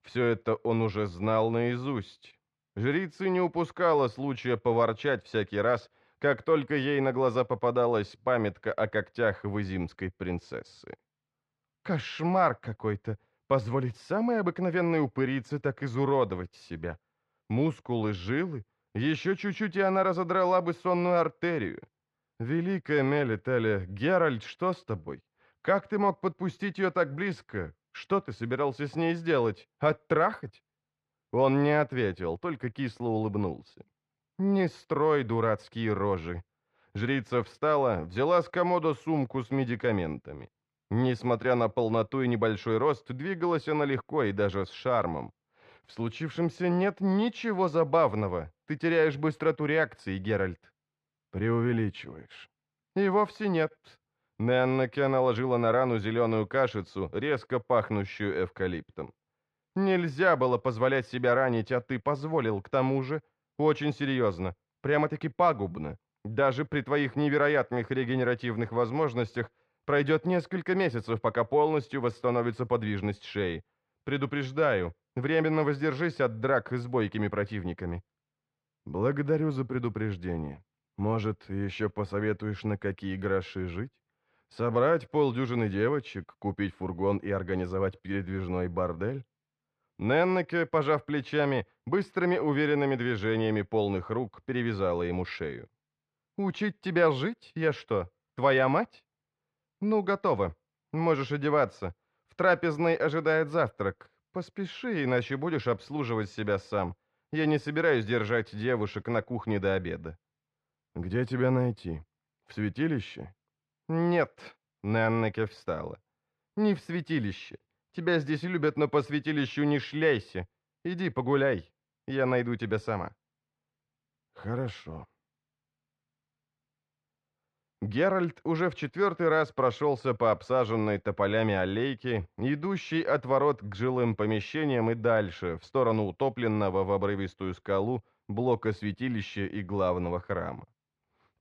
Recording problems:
muffled; slightly; fading above 2.5 kHz

